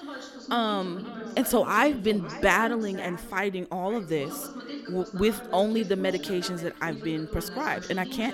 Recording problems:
echo of what is said; faint; throughout; 530 ms later, 20 dB below the speech
voice in the background; noticeable; throughout; 10 dB below the speech

